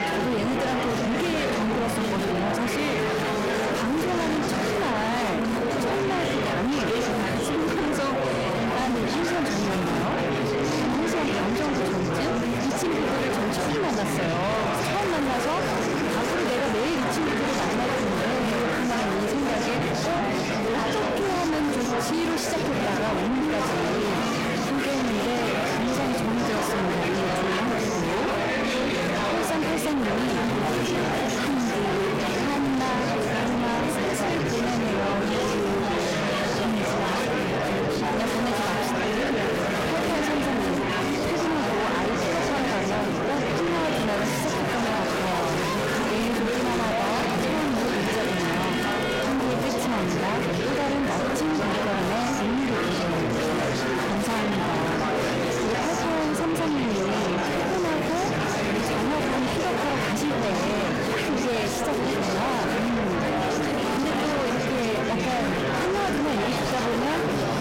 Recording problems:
distortion; heavy; 6 dB below the speech
murmuring crowd; very loud; throughout; 1 dB above the speech

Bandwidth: 16 kHz